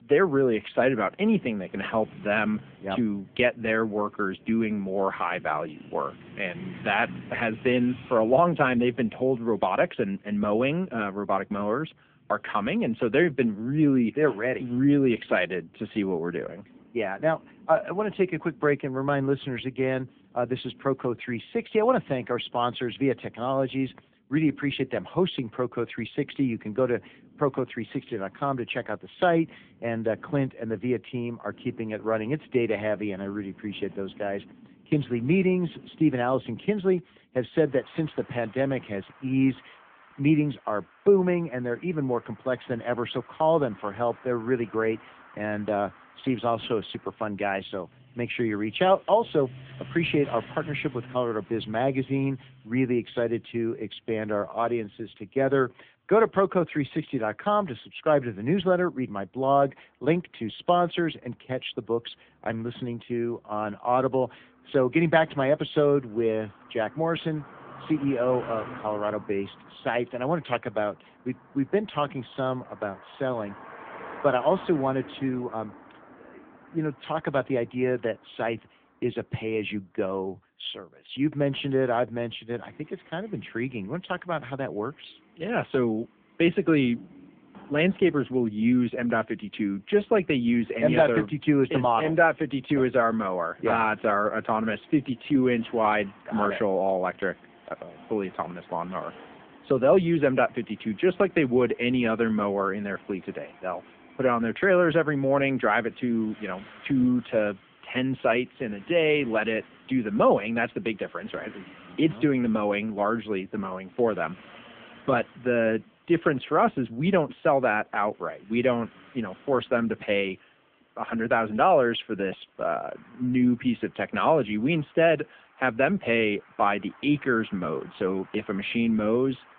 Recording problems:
phone-call audio
traffic noise; faint; throughout; 25 dB below the speech

